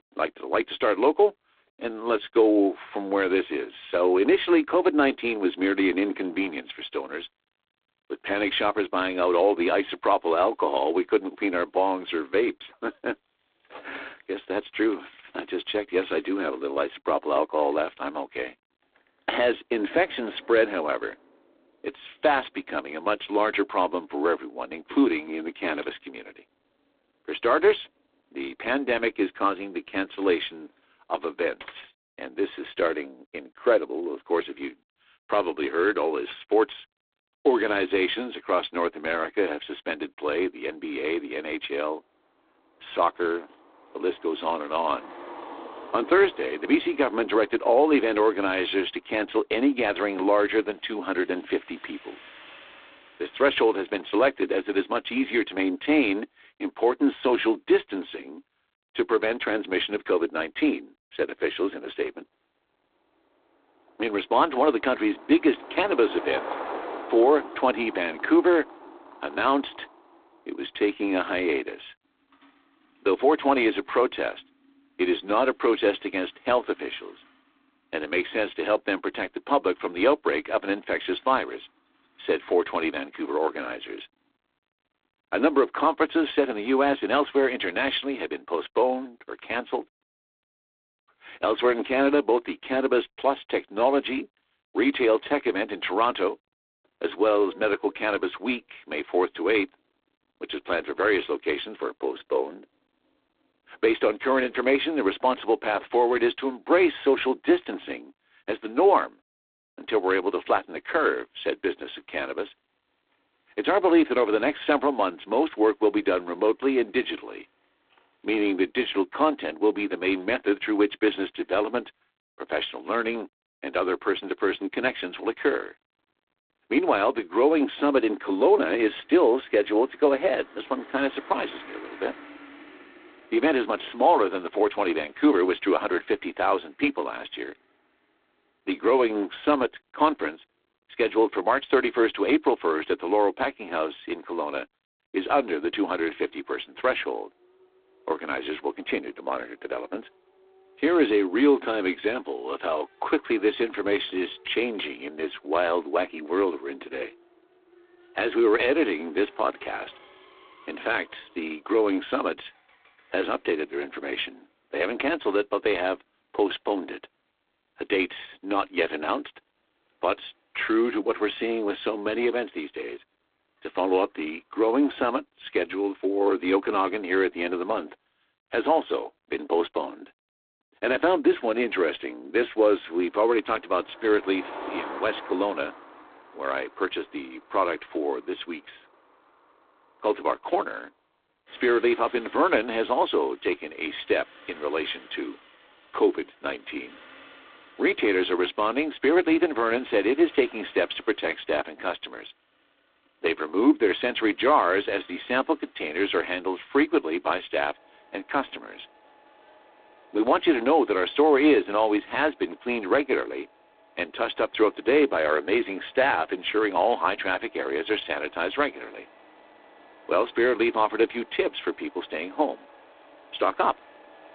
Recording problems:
phone-call audio; poor line
traffic noise; faint; throughout; 20 dB below the speech

